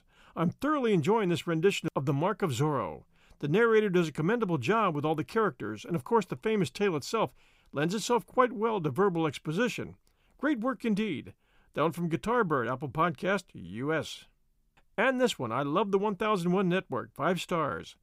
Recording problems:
none

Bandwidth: 15.5 kHz